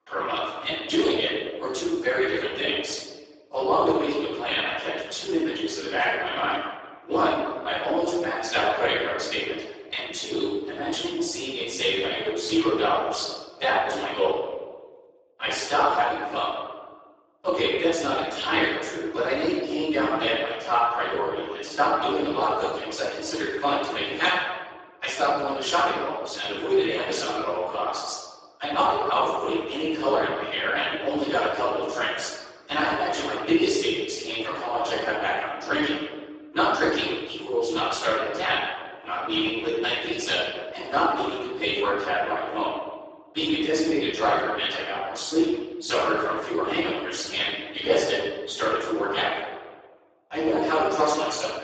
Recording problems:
room echo; strong; dies away in 1.1 s
off-mic speech; far
garbled, watery; badly; nothing above 7.5 kHz
thin; very; fading below 300 Hz

